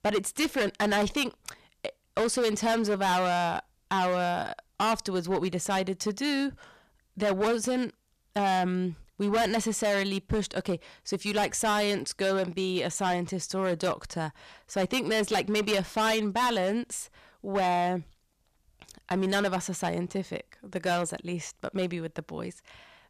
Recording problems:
distortion; heavy; 11% of the sound clipped

